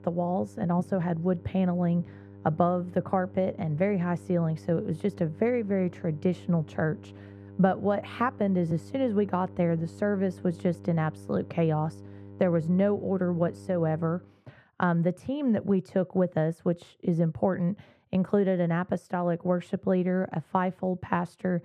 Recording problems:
muffled; very; fading above 3 kHz
electrical hum; faint; until 14 s; 50 Hz, 20 dB below the speech

